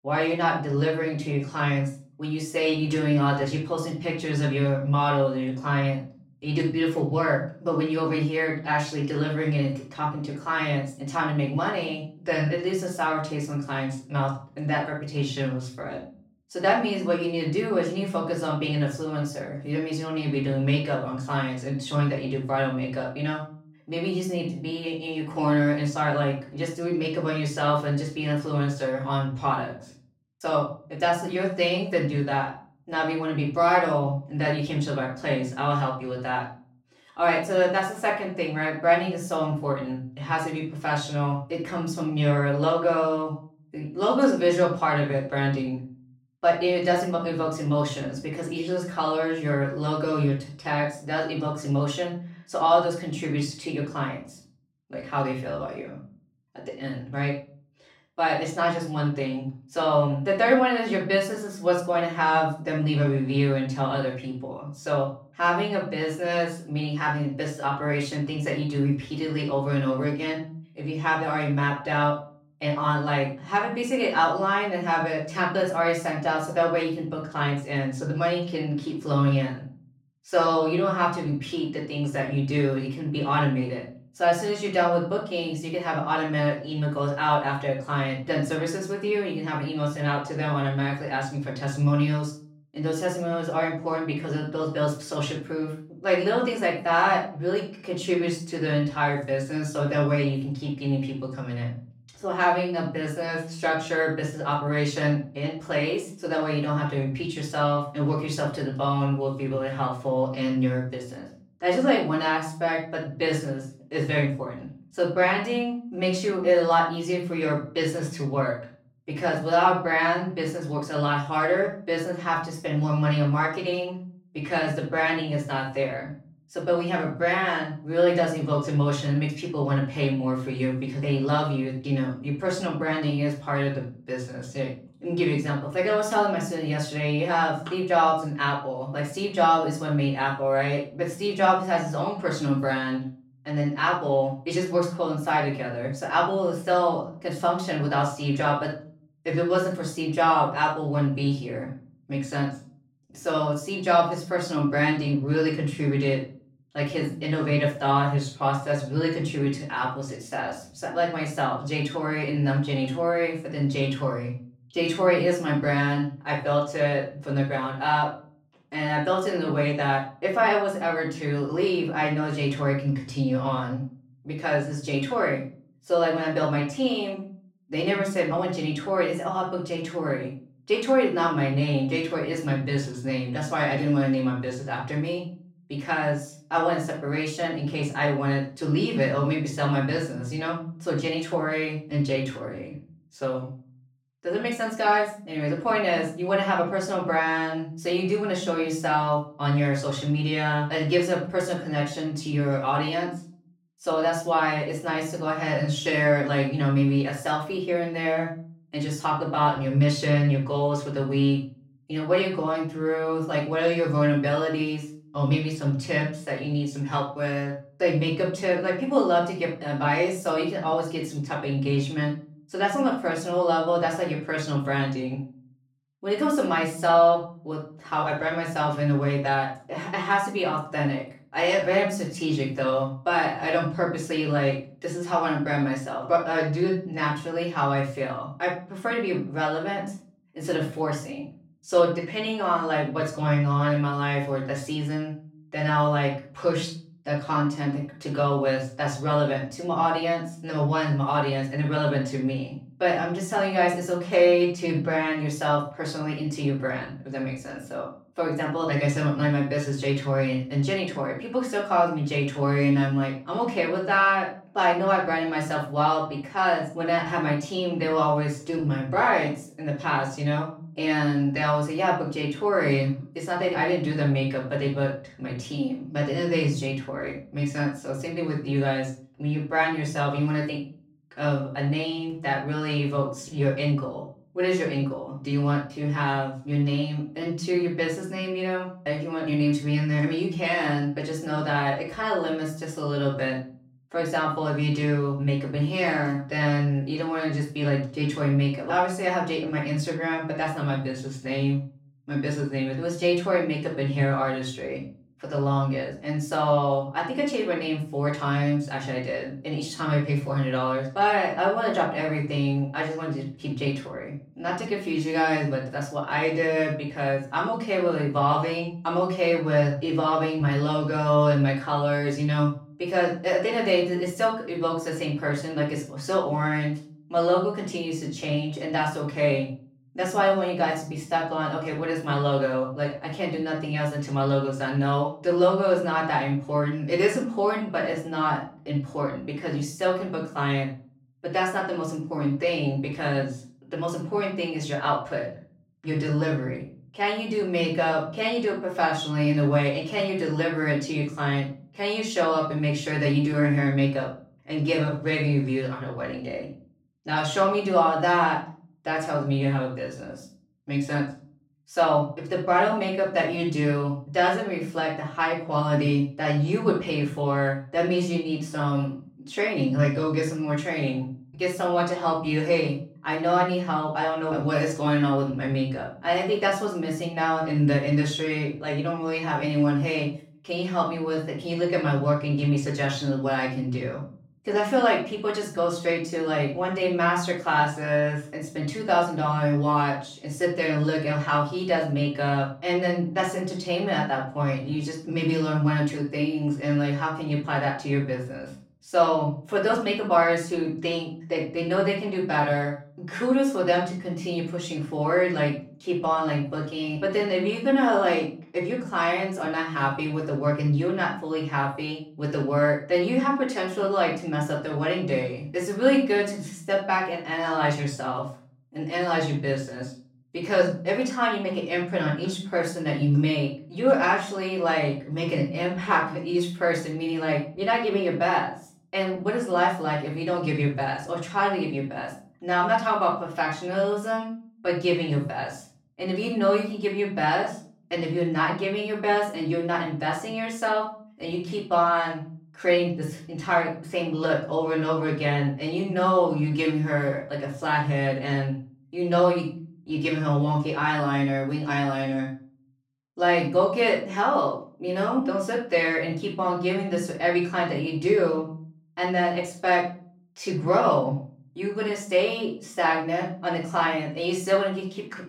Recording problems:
off-mic speech; far
room echo; slight; dies away in 0.4 s

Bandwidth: 17 kHz